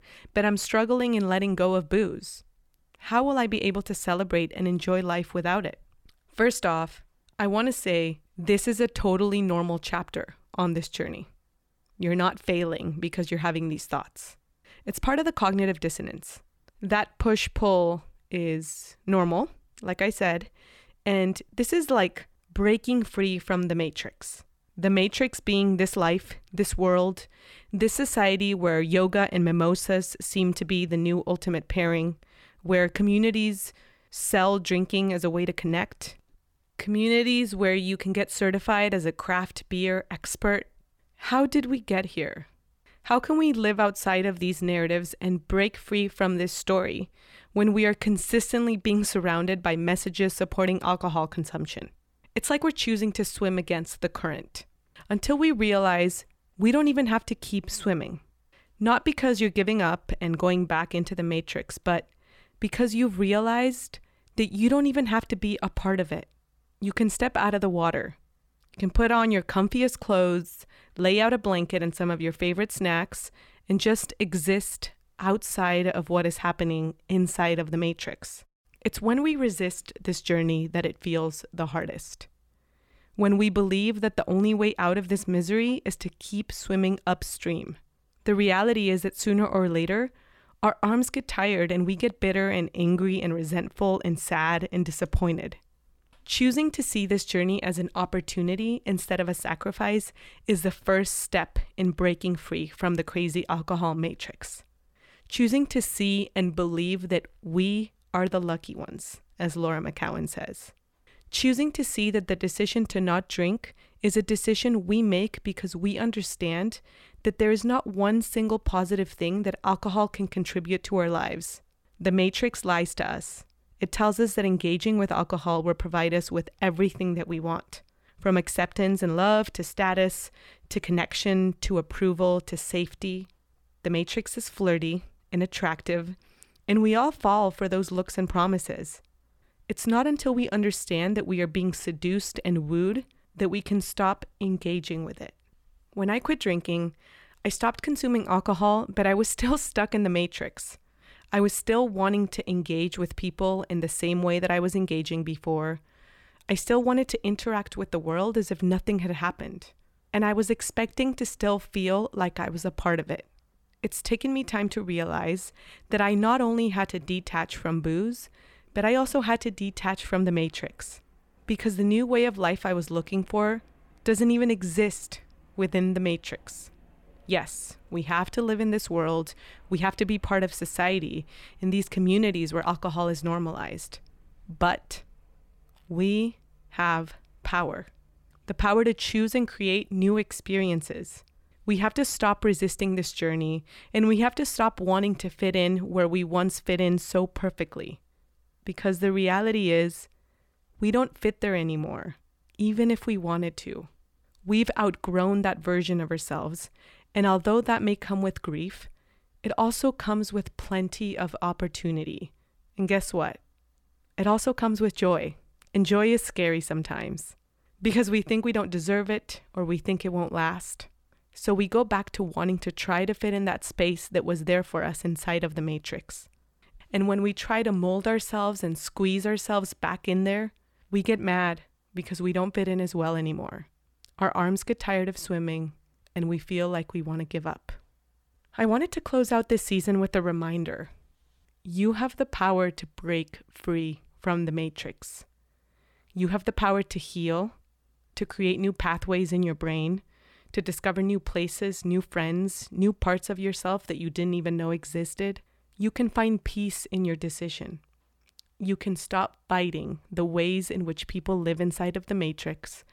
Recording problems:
none

